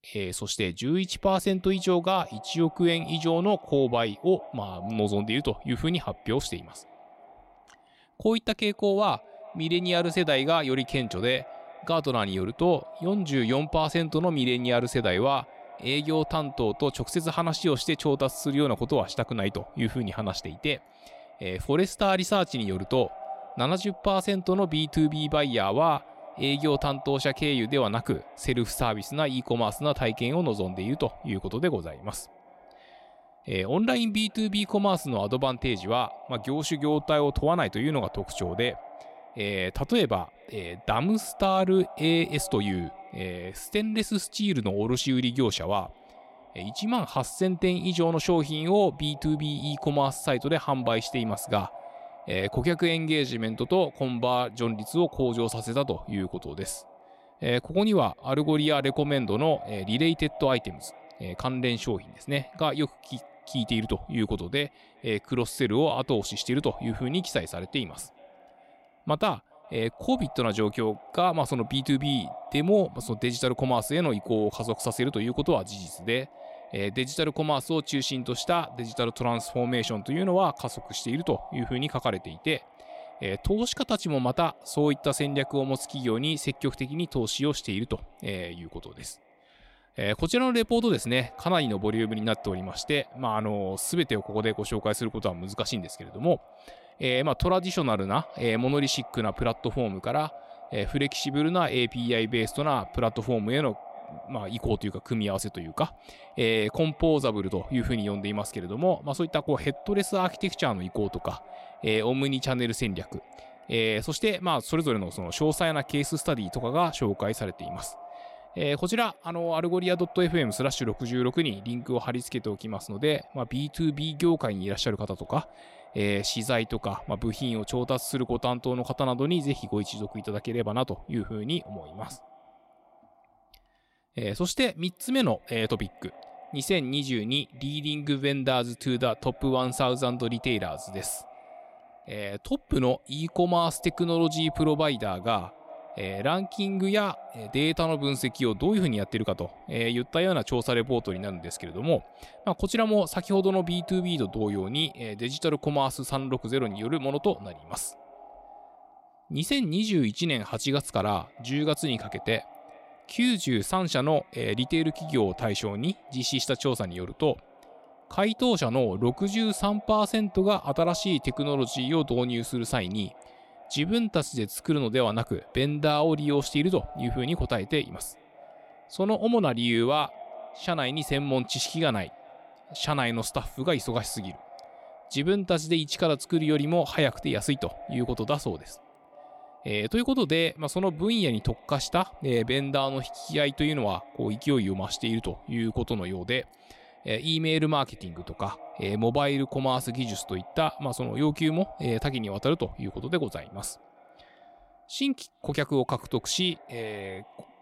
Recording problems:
echo of what is said; faint; throughout; 410 ms later, 20 dB below the speech

